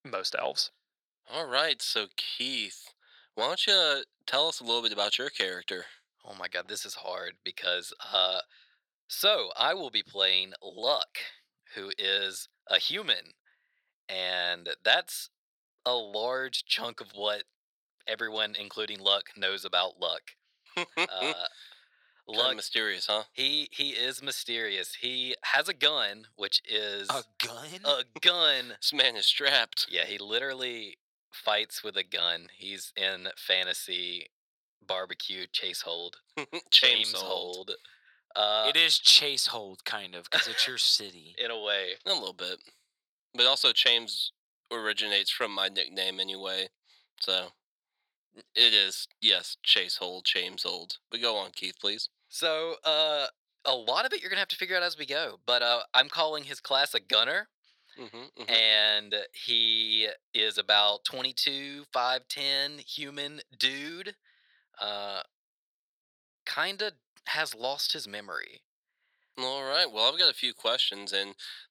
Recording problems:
thin; very; fading below 700 Hz

